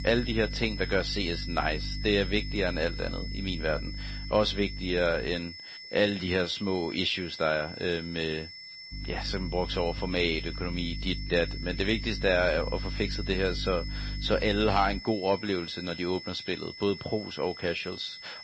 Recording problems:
garbled, watery; slightly
high-pitched whine; noticeable; throughout; 5.5 kHz, 10 dB below the speech
electrical hum; faint; until 5.5 s and from 9 to 15 s; 50 Hz, 20 dB below the speech

